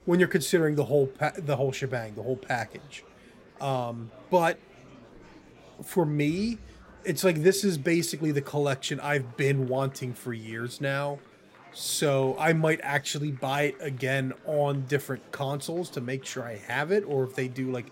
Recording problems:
murmuring crowd; faint; throughout; 25 dB below the speech

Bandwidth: 16 kHz